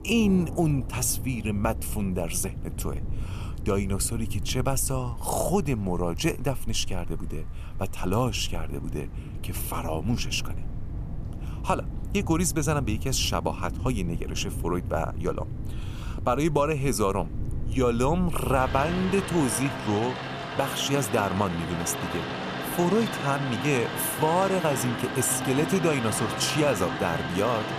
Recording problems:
rain or running water; loud; throughout; 7 dB below the speech

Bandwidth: 14.5 kHz